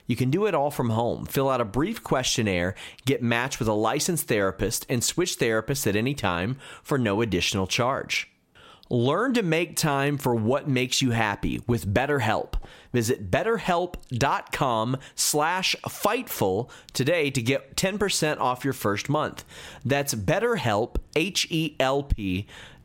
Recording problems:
squashed, flat; somewhat

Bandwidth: 16 kHz